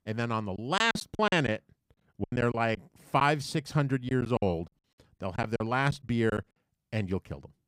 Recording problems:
choppy; very; from 0.5 to 3 s and from 4 to 6.5 s; 16% of the speech affected

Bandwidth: 15.5 kHz